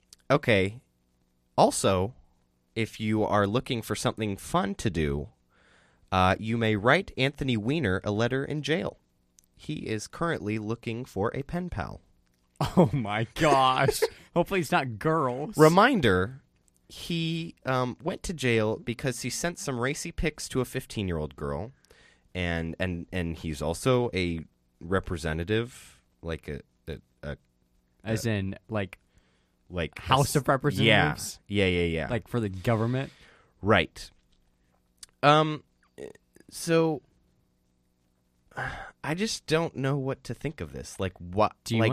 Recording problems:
abrupt cut into speech; at the end

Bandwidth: 14.5 kHz